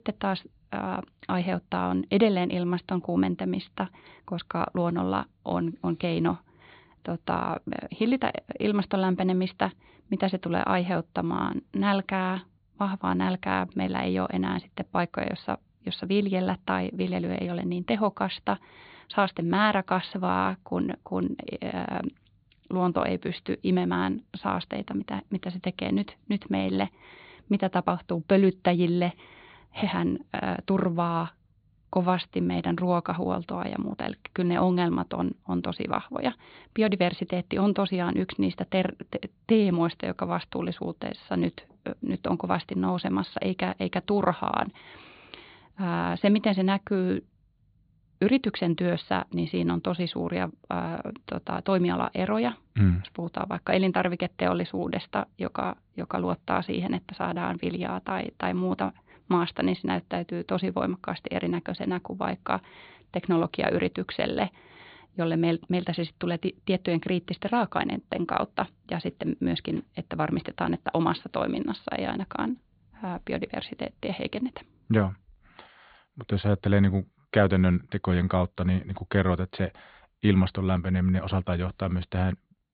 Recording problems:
high frequencies cut off; severe; nothing above 4.5 kHz

